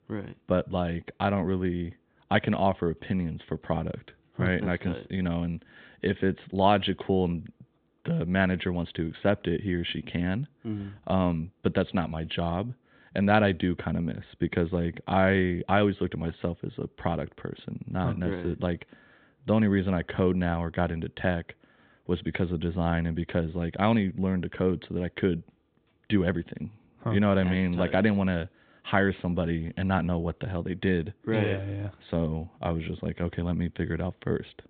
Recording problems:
high frequencies cut off; severe; nothing above 4 kHz

